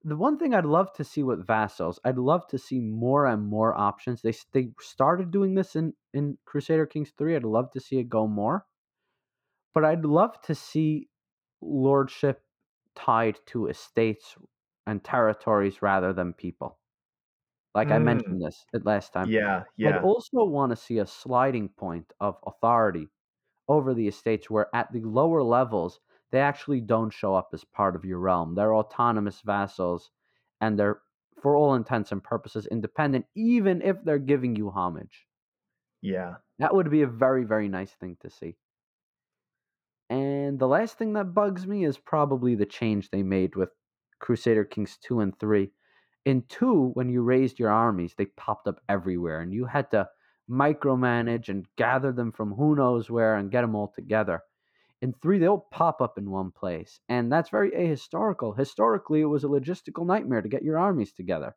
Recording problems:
muffled; very; fading above 3.5 kHz

